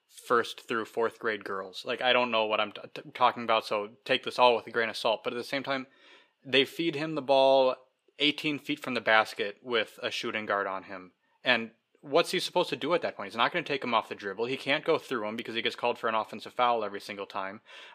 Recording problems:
thin; very slightly; fading below 300 Hz

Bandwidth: 15 kHz